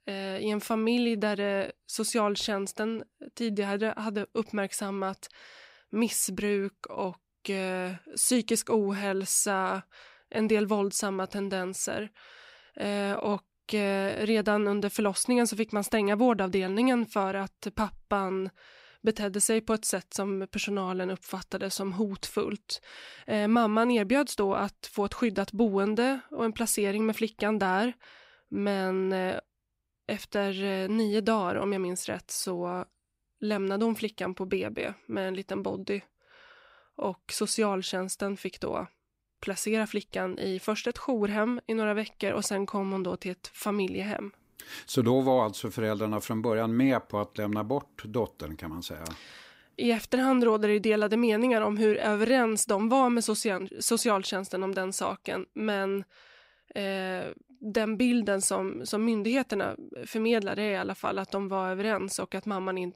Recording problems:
none

